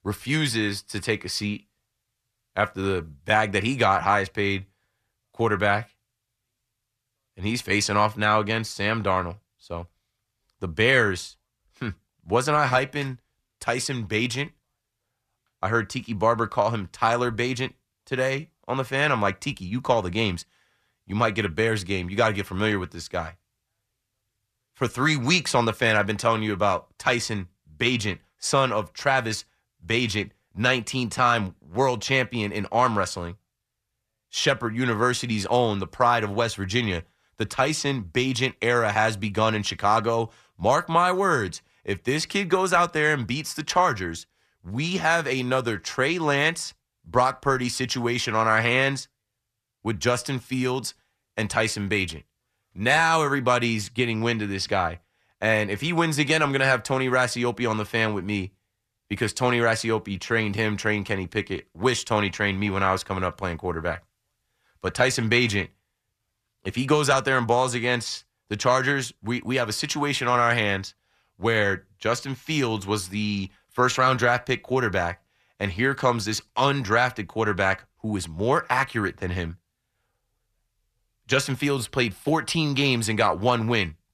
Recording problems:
none

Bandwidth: 14.5 kHz